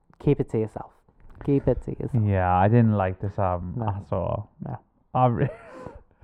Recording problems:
muffled; very; fading above 2 kHz

